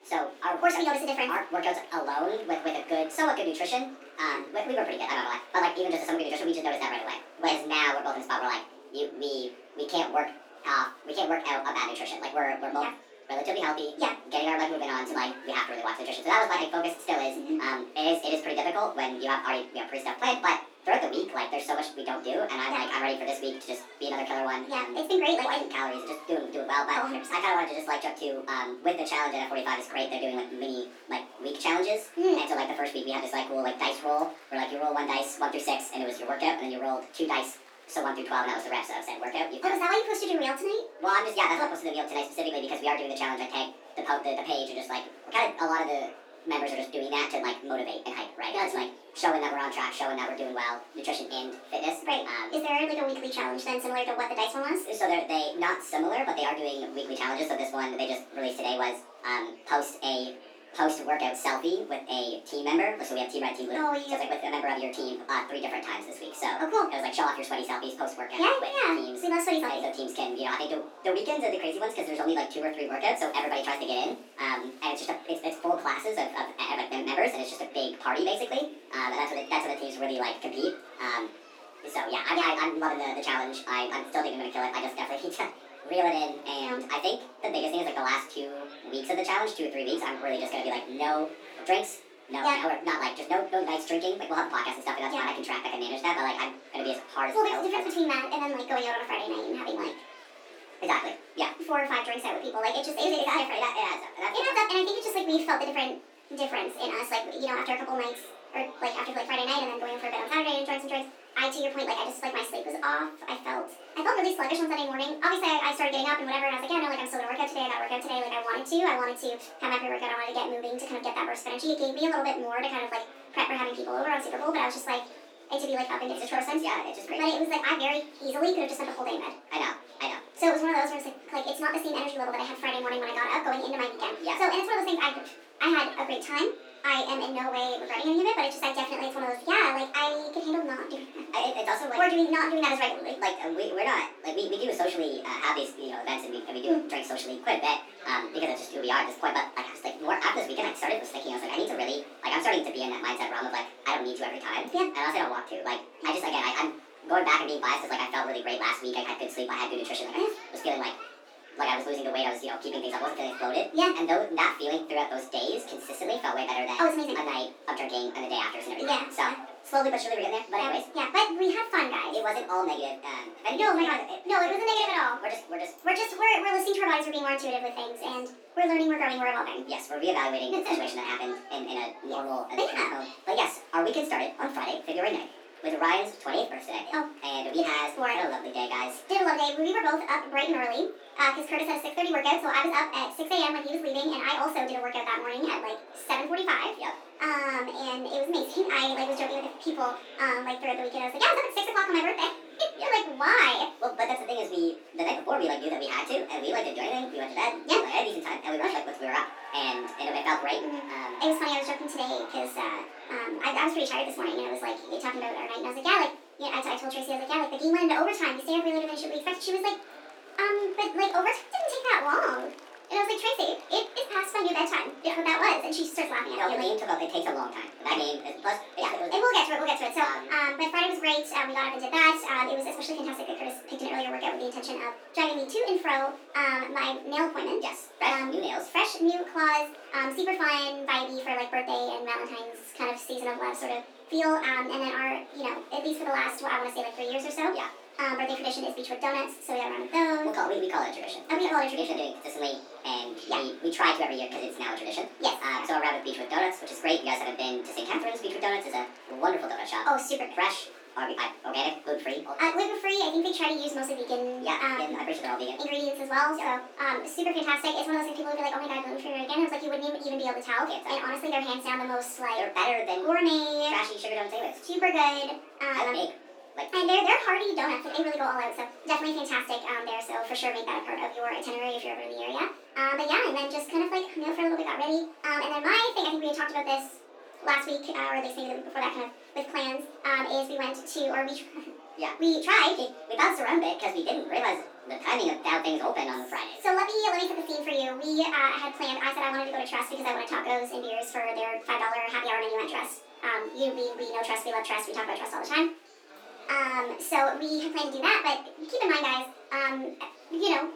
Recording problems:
off-mic speech; far
wrong speed and pitch; too fast and too high; 1.5 times normal speed
thin; somewhat; fading below 300 Hz
room echo; slight; dies away in 0.3 s
murmuring crowd; noticeable; throughout; 20 dB below the speech

